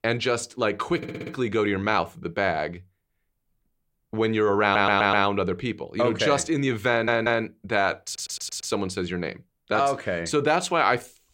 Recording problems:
audio stuttering; 4 times, first at 1 s

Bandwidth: 16 kHz